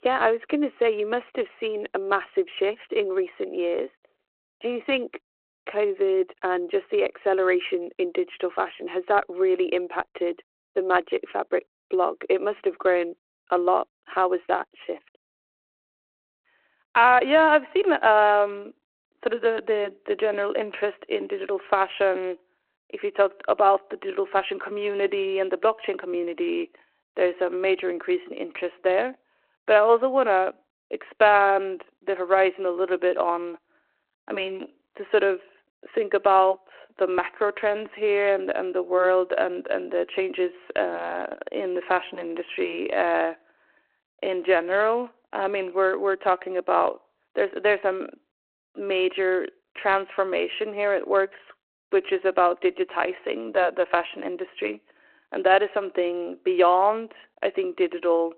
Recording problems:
phone-call audio

